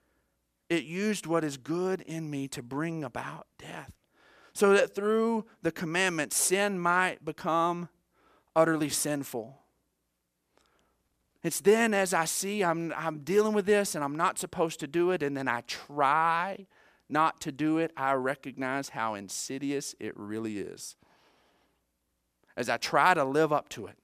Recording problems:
none

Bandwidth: 14.5 kHz